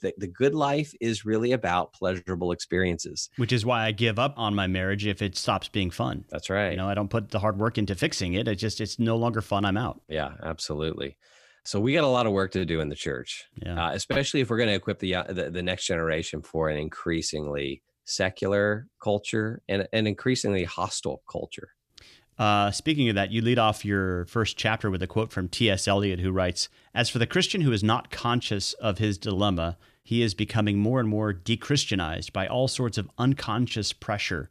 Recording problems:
none

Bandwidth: 14.5 kHz